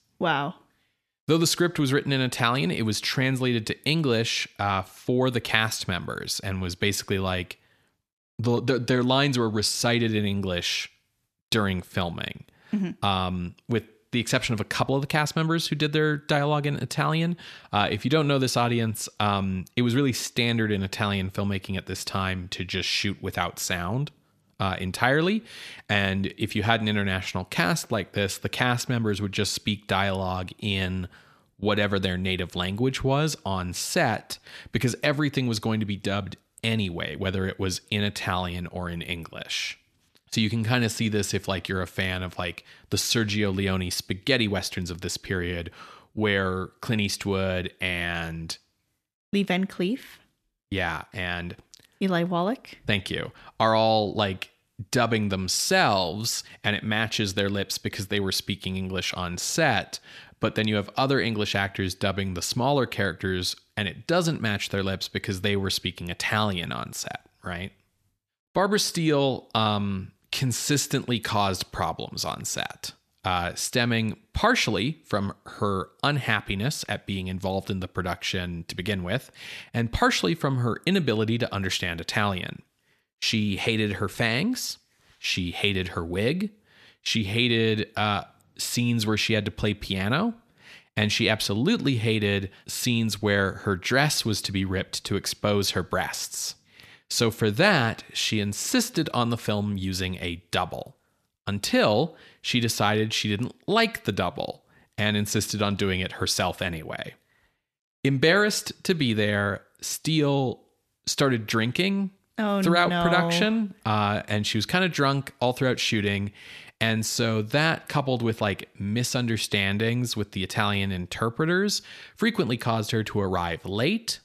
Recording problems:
none

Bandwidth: 14 kHz